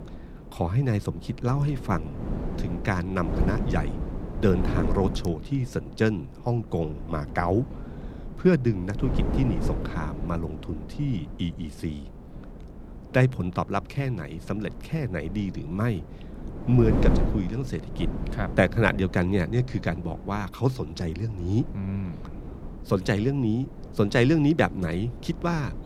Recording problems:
wind noise on the microphone; occasional gusts; 10 dB below the speech

